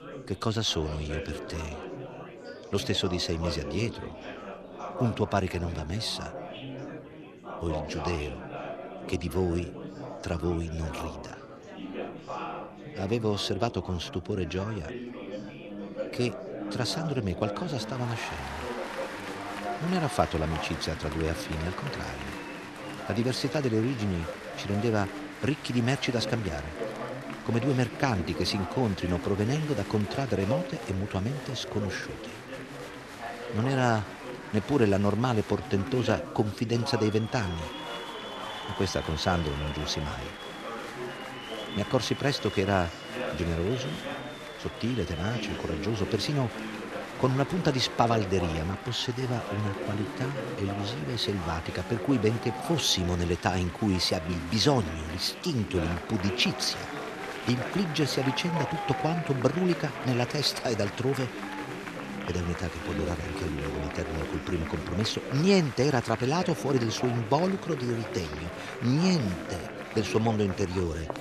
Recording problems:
murmuring crowd; loud; throughout; 8 dB below the speech

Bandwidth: 13.5 kHz